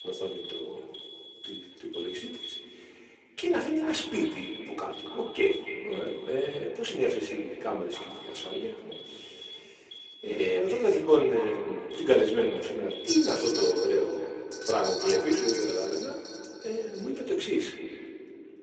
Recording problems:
echo of what is said; strong; throughout; 280 ms later, 10 dB below the speech
off-mic speech; far
garbled, watery; badly; nothing above 8 kHz
thin; very; fading below 350 Hz
room echo; slight; dies away in 0.3 s
alarms or sirens; noticeable; throughout; 15 dB below the speech

